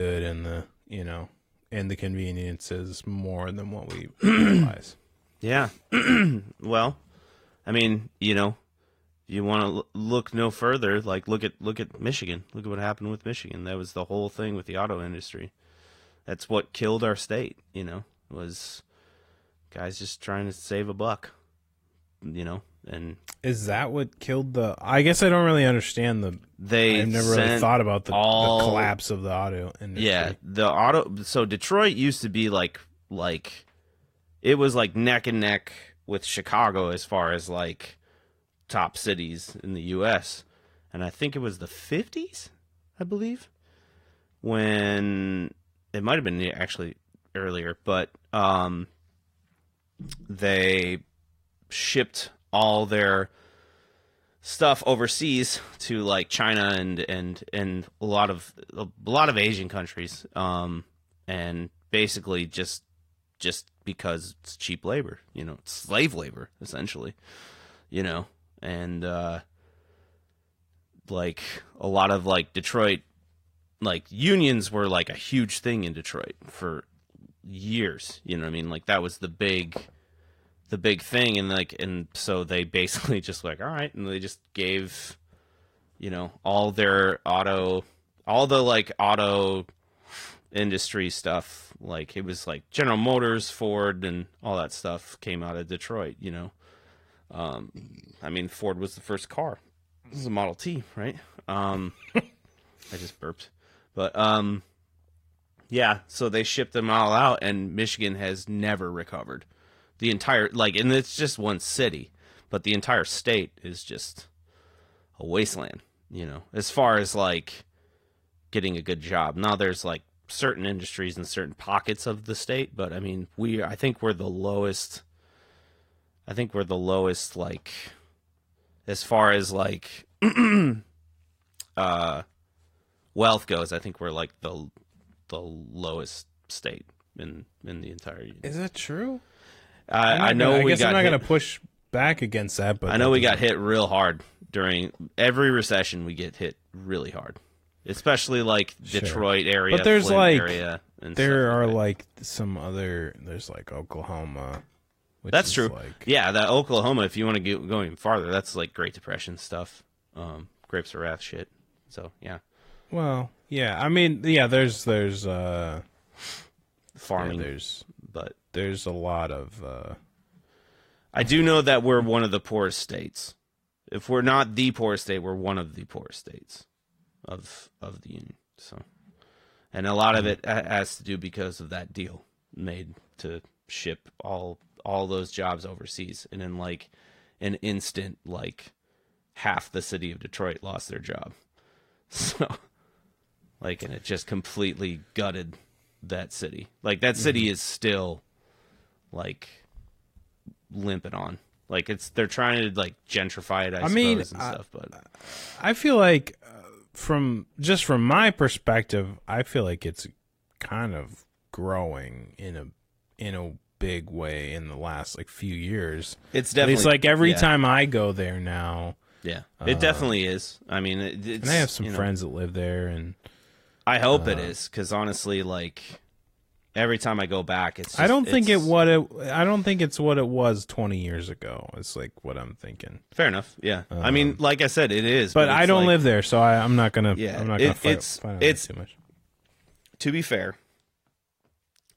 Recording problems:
garbled, watery; slightly; nothing above 15.5 kHz
abrupt cut into speech; at the start

